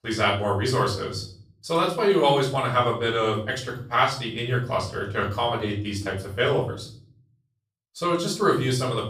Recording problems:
off-mic speech; far
room echo; slight; dies away in 0.5 s

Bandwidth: 14.5 kHz